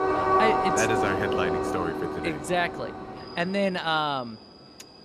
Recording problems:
train or aircraft noise; very loud; throughout; 2 dB above the speech

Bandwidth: 15 kHz